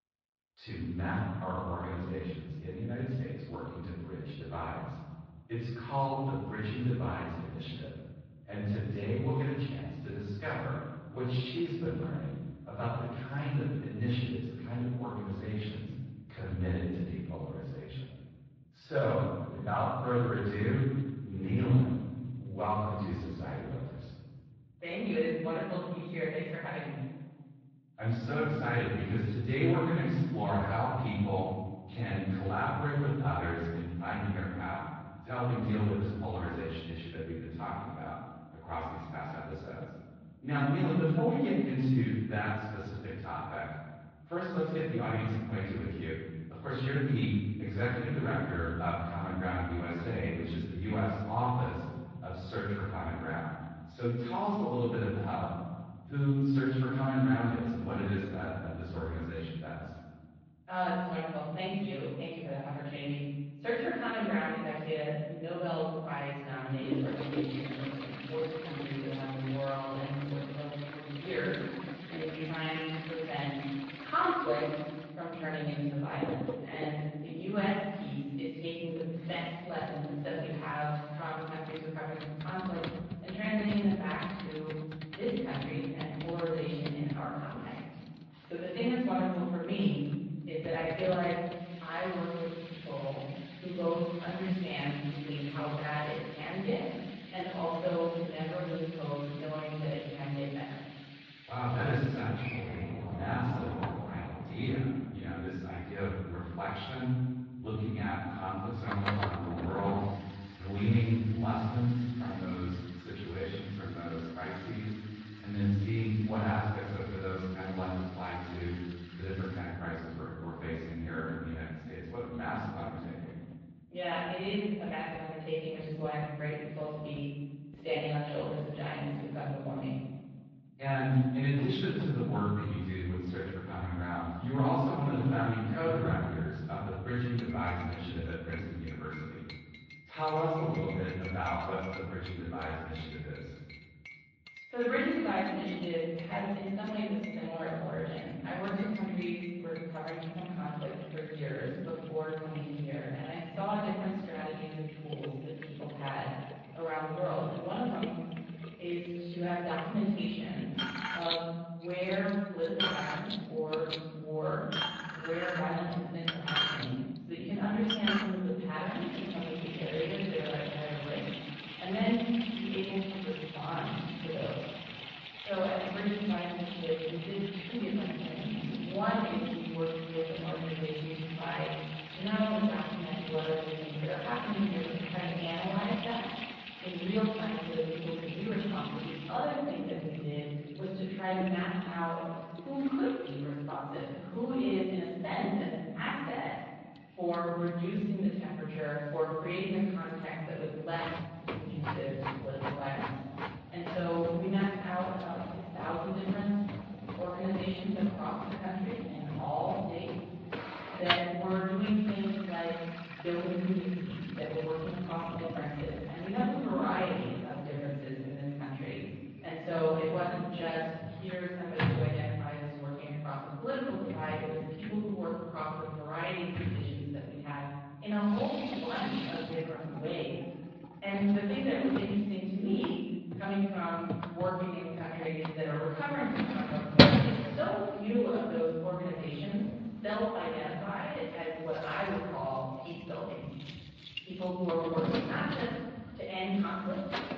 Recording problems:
room echo; strong; dies away in 1.7 s
off-mic speech; far
muffled; slightly; fading above 4 kHz
garbled, watery; slightly
household noises; loud; from 1:07 on; 5 dB below the speech
uneven, jittery; strongly; from 19 s to 3:35

